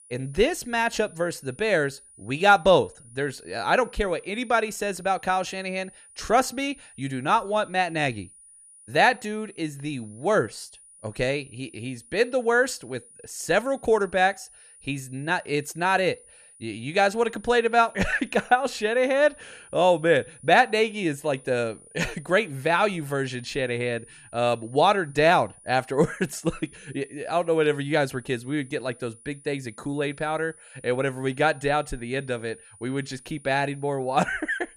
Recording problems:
high-pitched whine; faint; throughout; 9.5 kHz, 25 dB below the speech

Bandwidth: 14.5 kHz